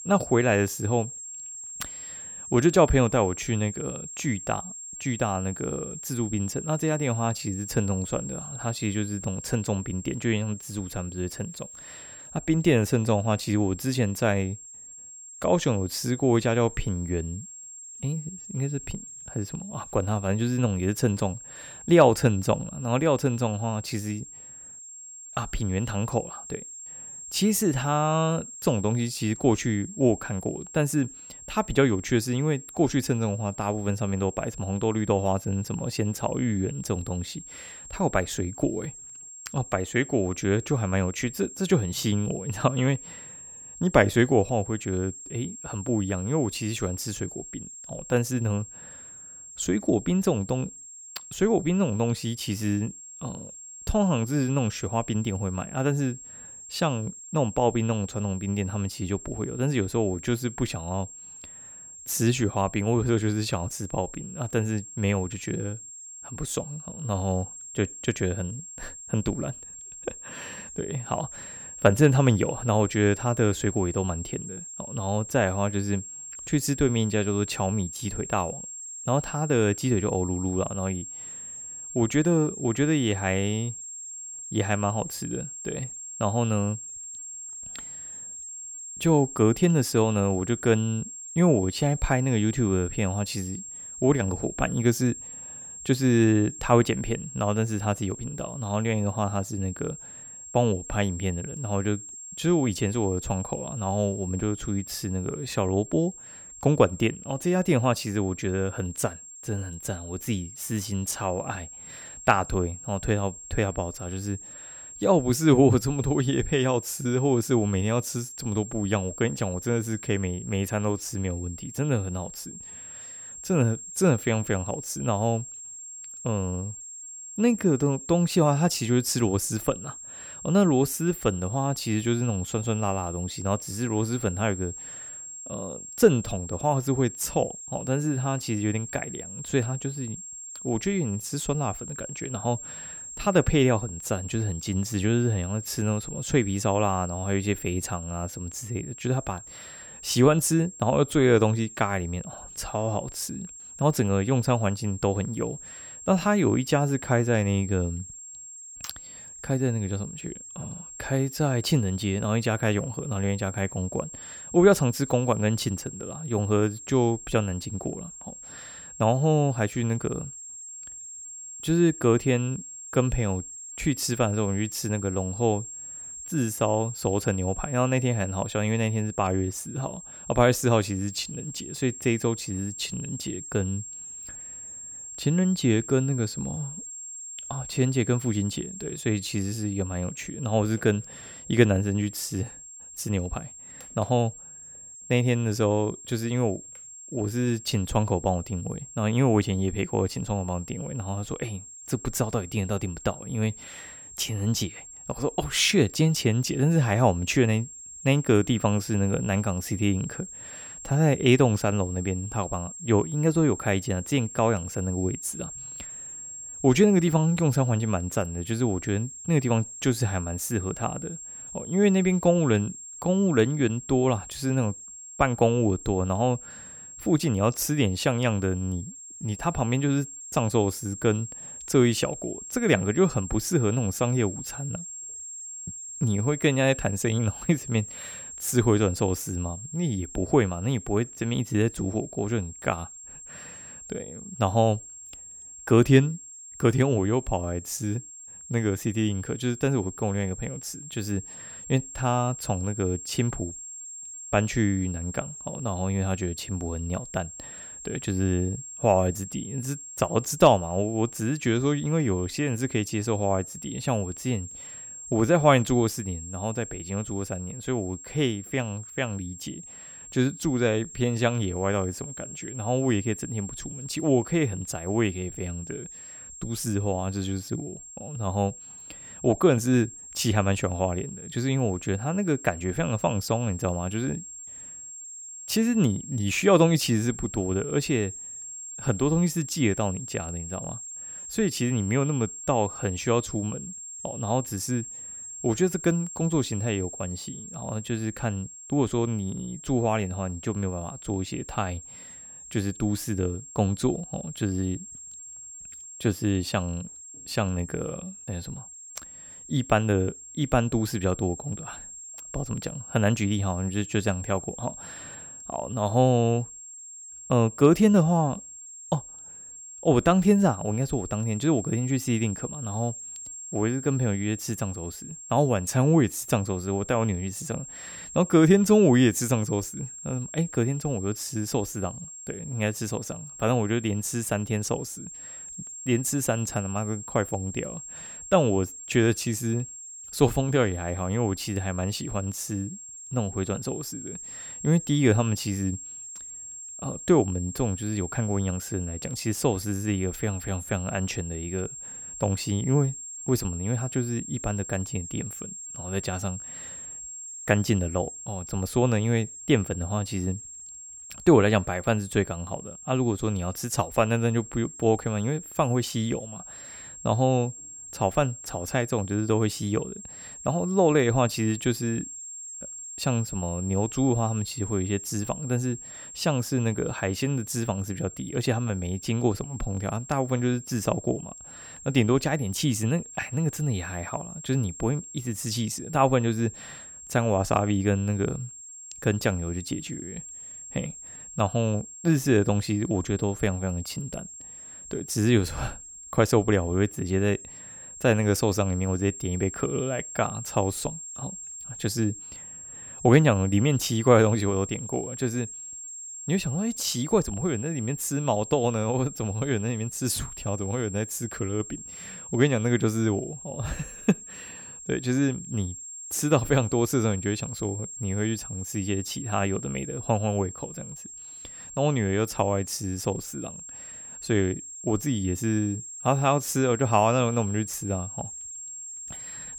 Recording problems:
high-pitched whine; noticeable; throughout; 7.5 kHz, 10 dB below the speech

